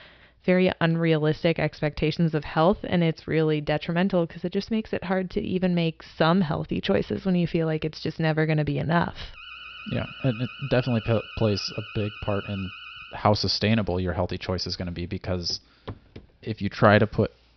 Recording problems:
high frequencies cut off; noticeable; nothing above 5.5 kHz
alarm; faint; from 9.5 to 13 s; peak 15 dB below the speech
footsteps; faint; at 15 s; peak 15 dB below the speech

